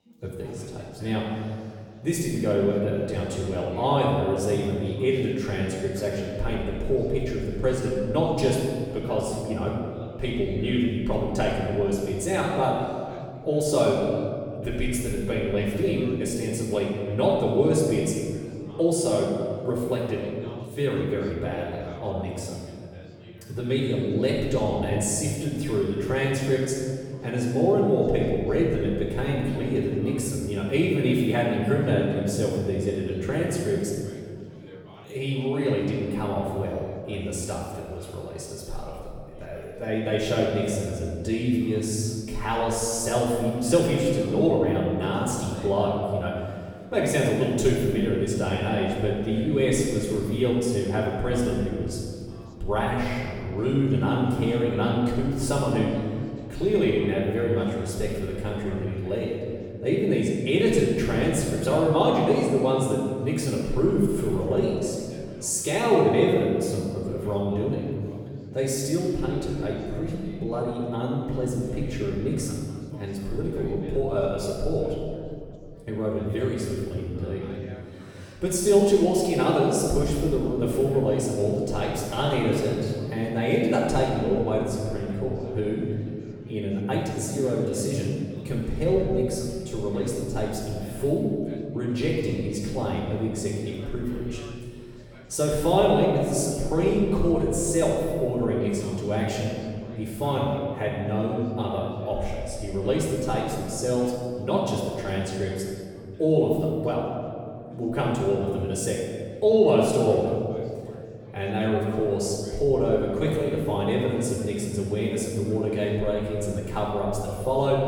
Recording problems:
room echo; strong; dies away in 2.1 s
off-mic speech; far
chatter from many people; faint; throughout; 25 dB below the speech

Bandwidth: 18 kHz